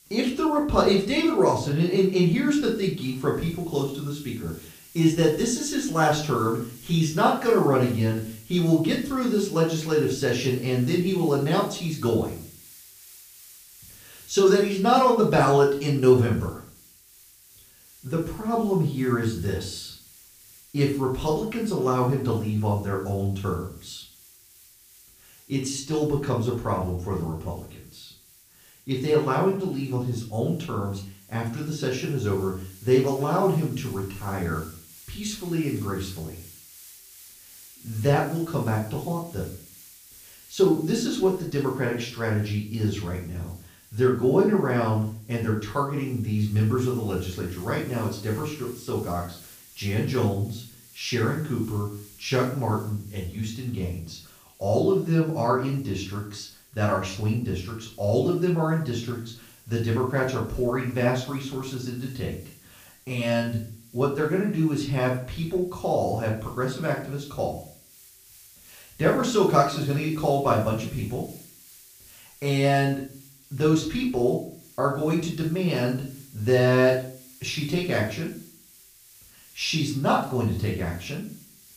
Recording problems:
off-mic speech; far
room echo; slight; dies away in 0.4 s
hiss; faint; throughout; 25 dB below the speech

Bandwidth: 15 kHz